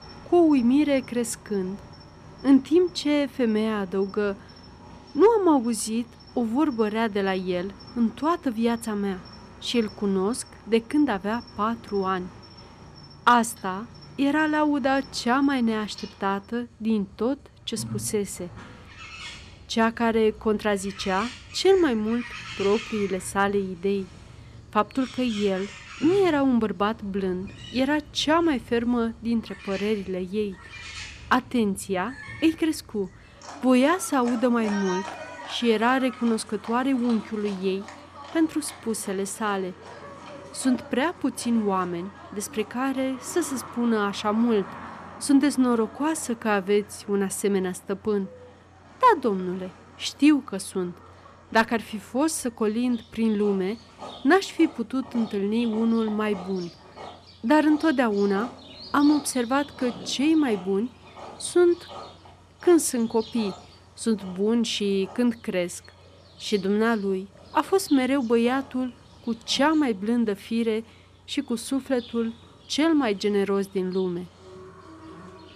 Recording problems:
animal sounds; noticeable; throughout; 20 dB below the speech

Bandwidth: 14.5 kHz